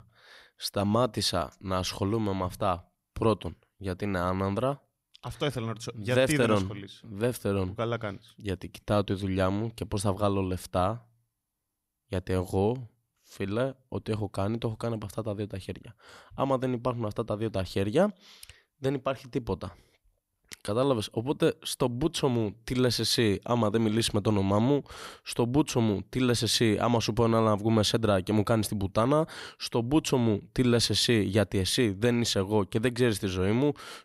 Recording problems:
none

